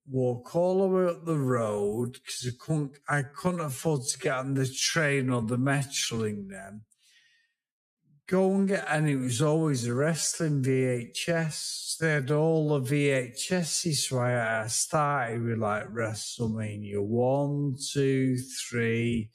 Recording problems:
wrong speed, natural pitch; too slow; 0.5 times normal speed

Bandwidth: 14.5 kHz